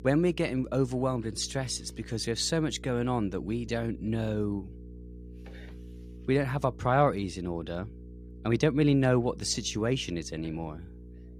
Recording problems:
electrical hum; faint; throughout; 60 Hz, 25 dB below the speech

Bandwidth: 14.5 kHz